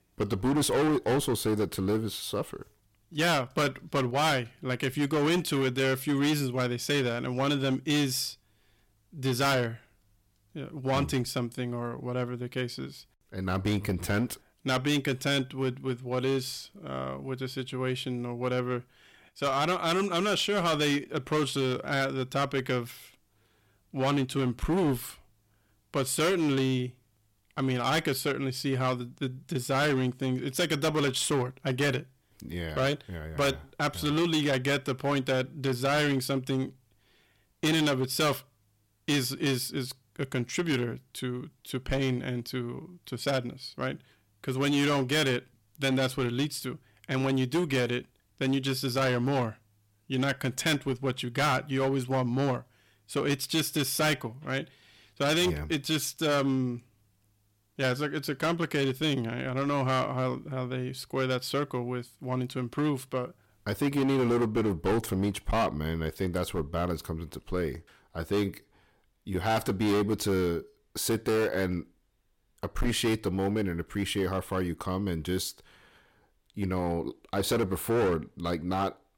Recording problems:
distortion; heavy; 10% of the sound clipped

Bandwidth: 16.5 kHz